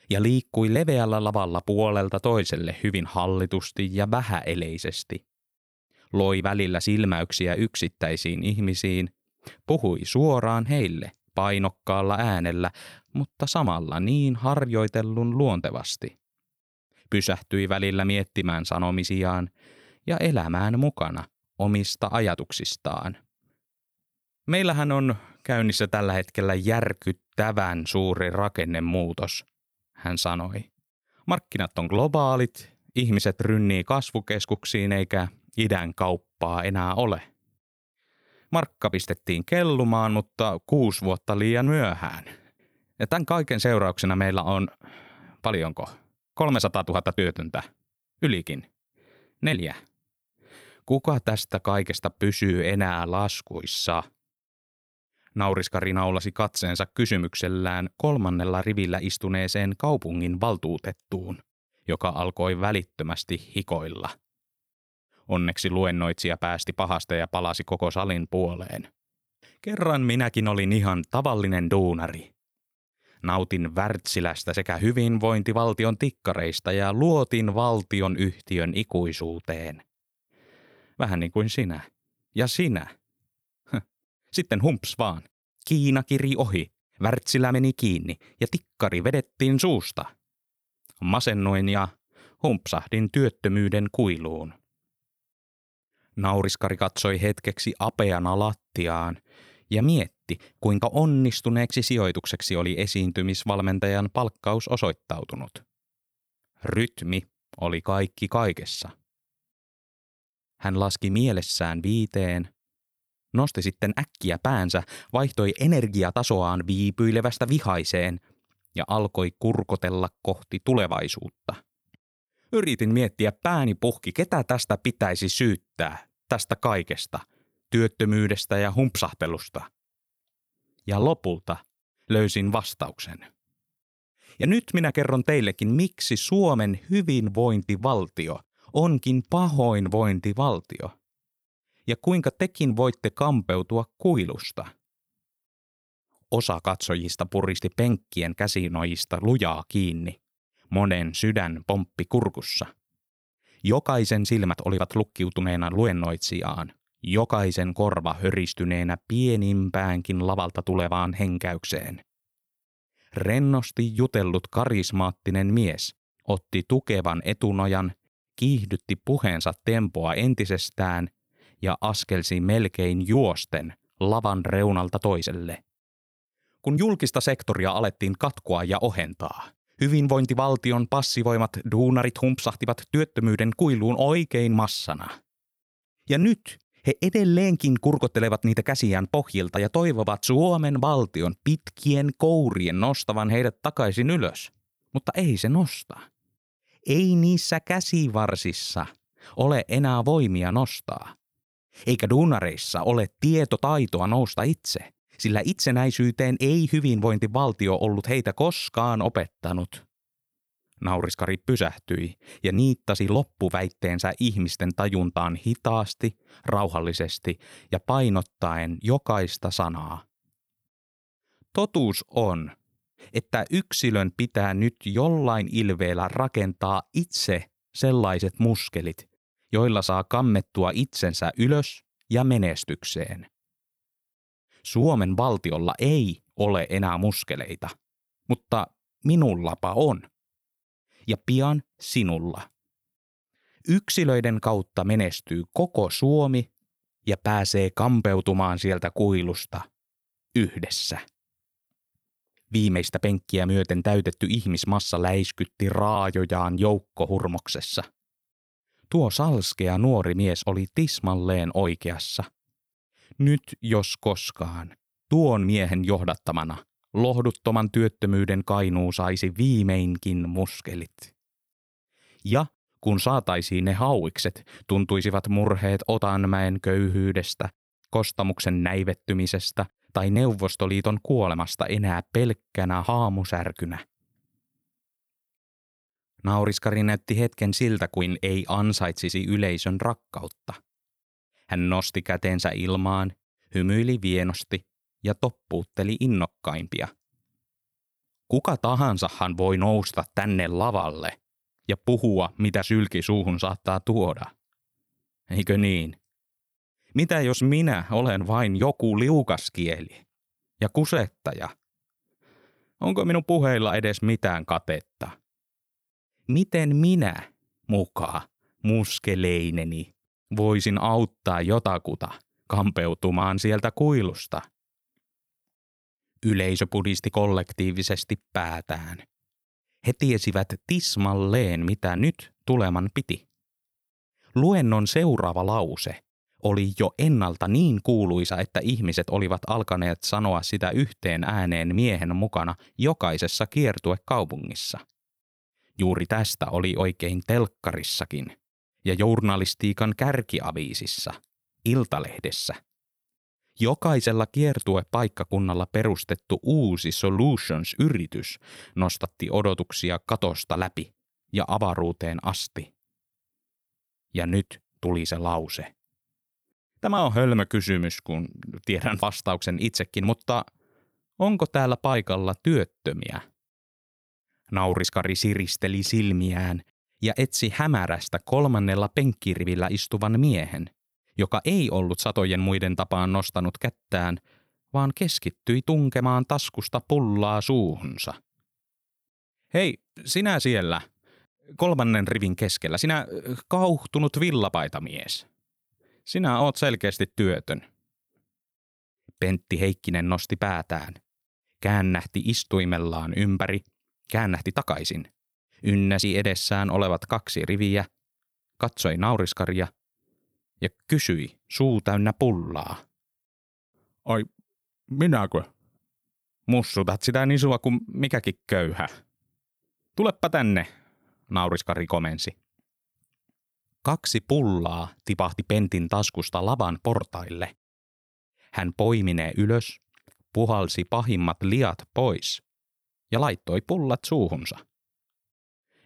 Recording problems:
none

